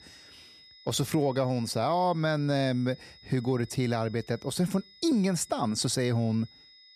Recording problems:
high-pitched whine; faint; throughout; 5 kHz, 25 dB below the speech

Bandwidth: 14.5 kHz